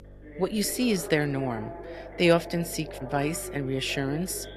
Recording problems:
voice in the background; noticeable; throughout; 15 dB below the speech
electrical hum; faint; throughout; 50 Hz, 30 dB below the speech
animal sounds; faint; throughout; 25 dB below the speech

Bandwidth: 13.5 kHz